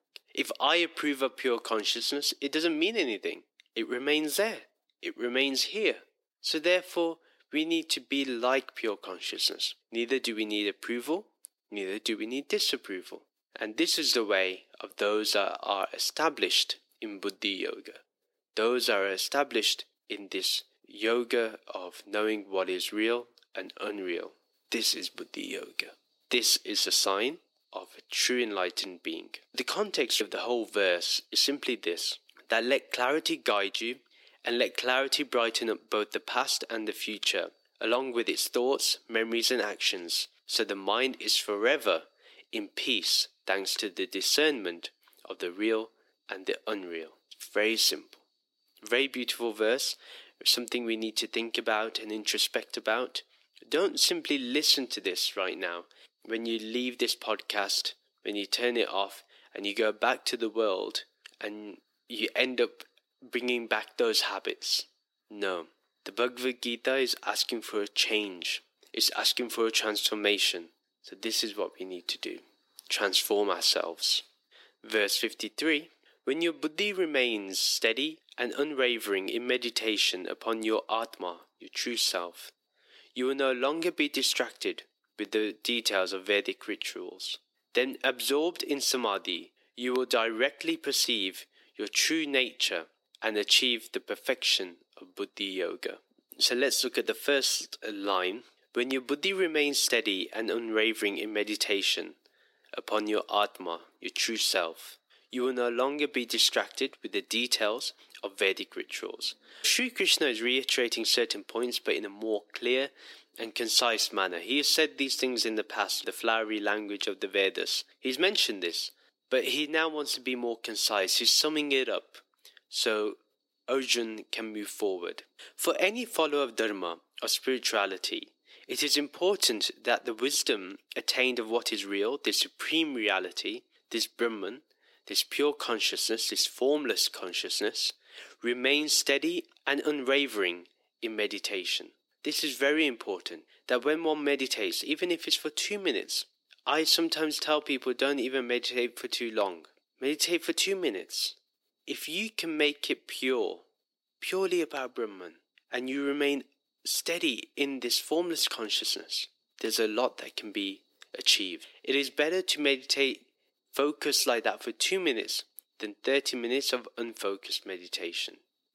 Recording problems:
thin; somewhat; fading below 300 Hz

